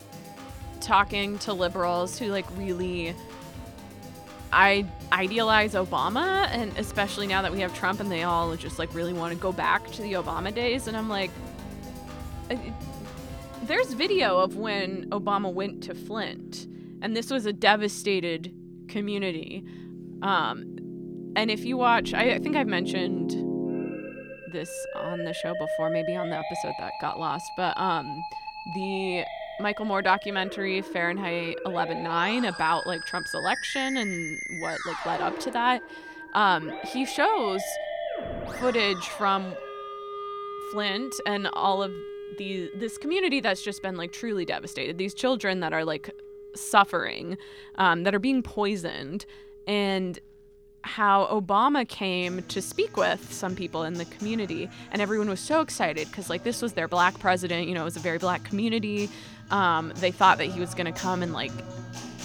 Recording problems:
background music; noticeable; throughout; 10 dB below the speech

